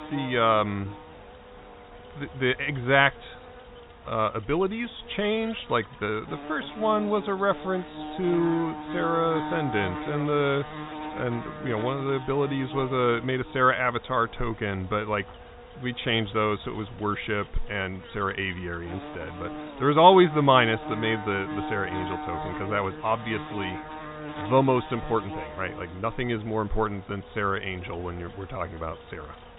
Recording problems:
high frequencies cut off; severe; nothing above 4 kHz
electrical hum; noticeable; throughout; 60 Hz, 15 dB below the speech

